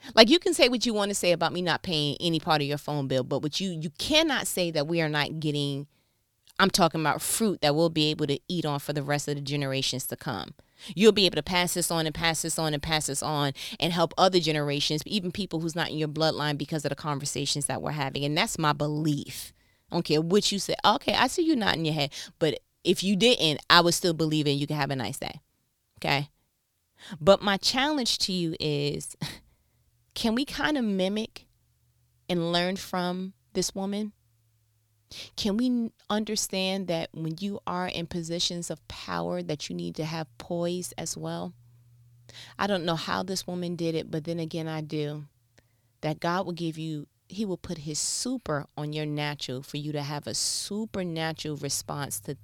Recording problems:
none

